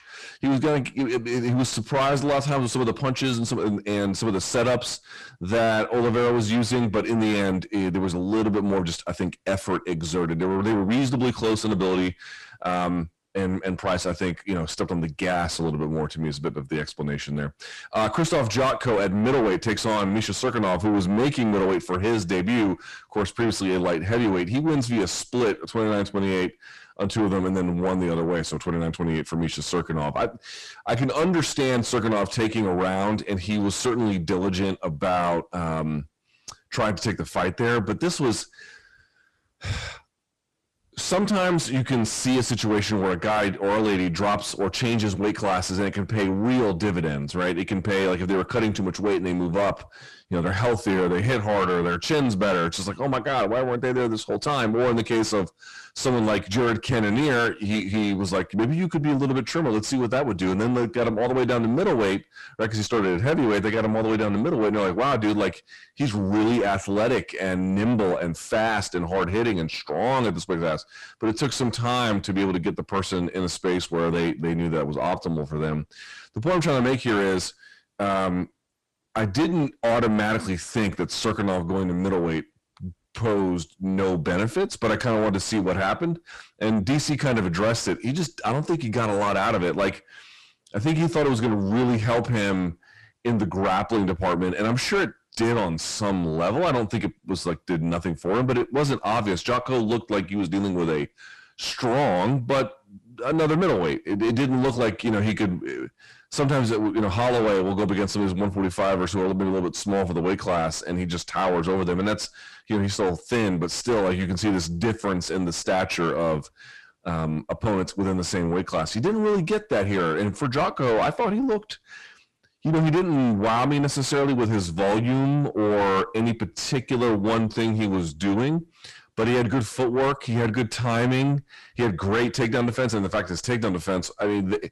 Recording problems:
distortion; heavy; 6 dB below the speech

